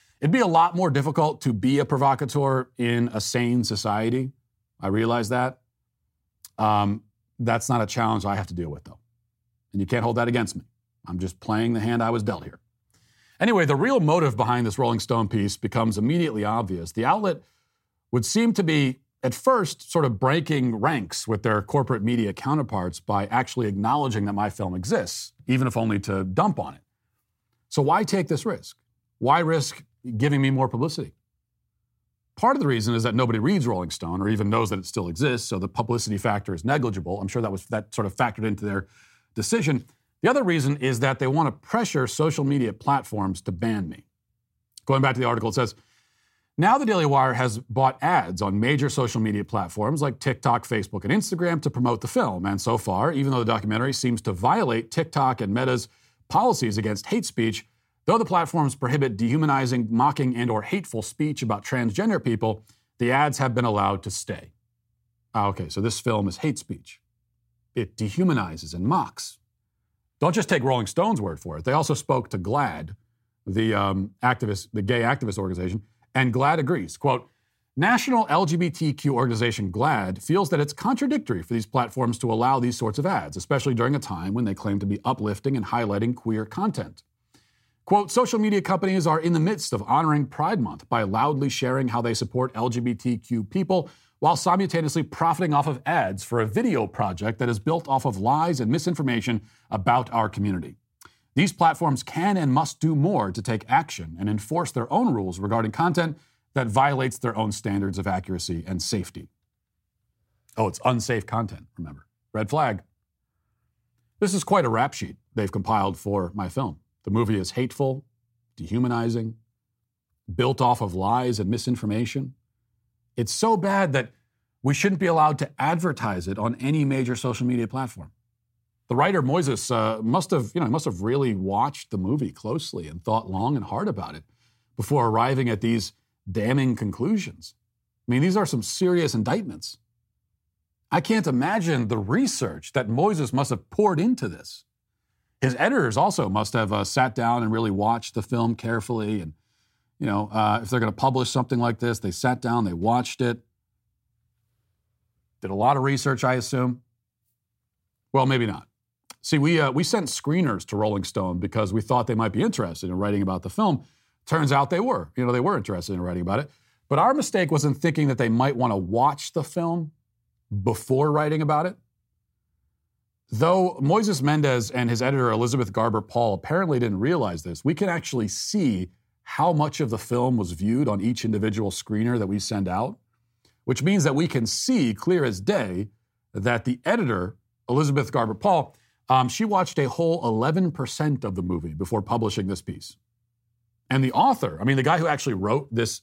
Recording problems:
none

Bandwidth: 16 kHz